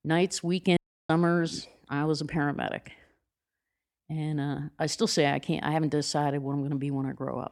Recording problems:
audio cutting out; at 1 s

